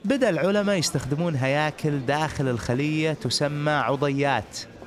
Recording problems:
murmuring crowd; noticeable; throughout; 20 dB below the speech

